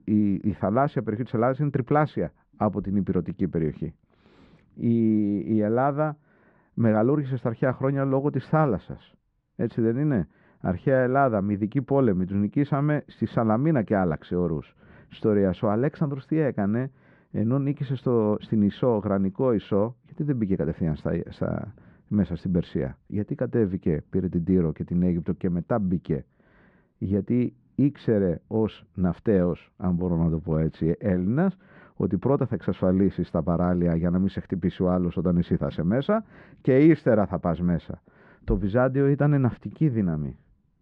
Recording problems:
muffled; very; fading above 1.5 kHz

